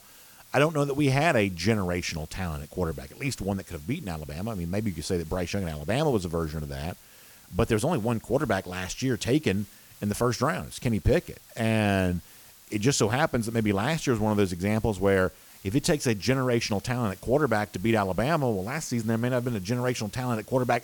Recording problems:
hiss; faint; throughout; 20 dB below the speech

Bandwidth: 18.5 kHz